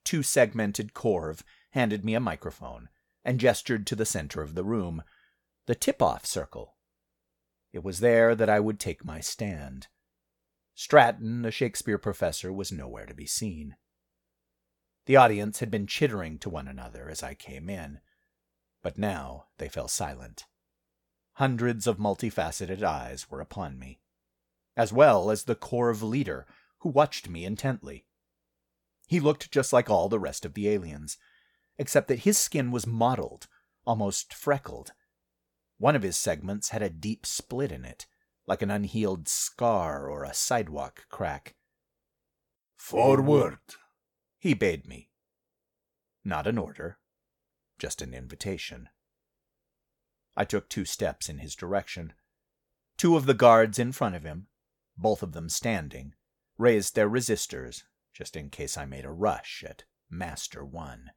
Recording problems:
none

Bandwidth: 18 kHz